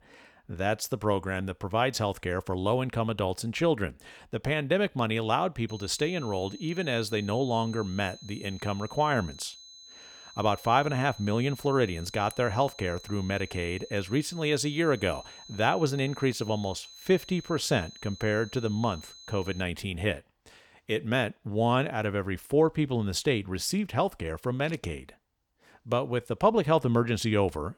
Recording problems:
high-pitched whine; noticeable; from 5.5 to 20 s; 4 kHz, 20 dB below the speech

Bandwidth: 18.5 kHz